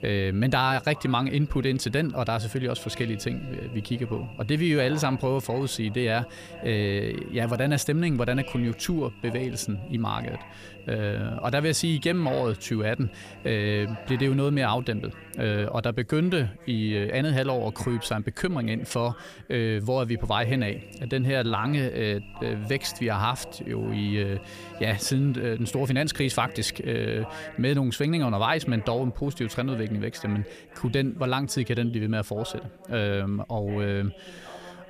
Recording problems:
electrical hum; noticeable; until 15 s and from 20 to 28 s; 50 Hz, 20 dB below the speech
voice in the background; noticeable; throughout; 20 dB below the speech

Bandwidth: 14.5 kHz